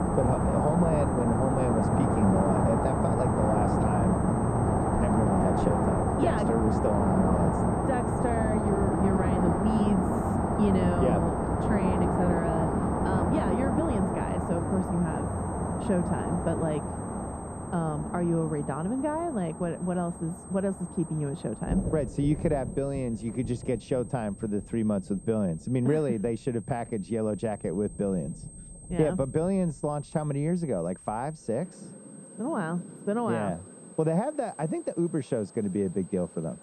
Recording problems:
muffled; very; fading above 1.5 kHz
rain or running water; very loud; throughout; 2 dB above the speech
high-pitched whine; noticeable; throughout; 8.5 kHz, 20 dB below the speech

